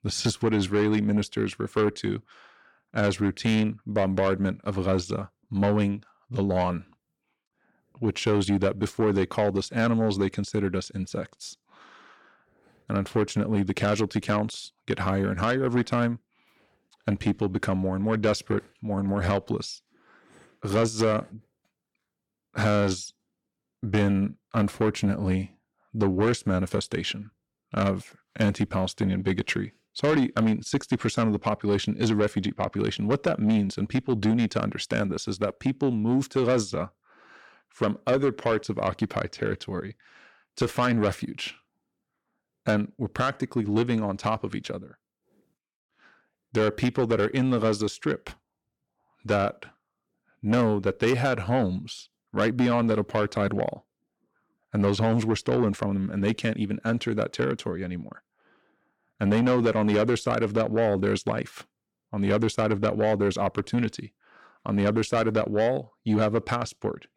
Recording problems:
distortion; slight; 10 dB below the speech

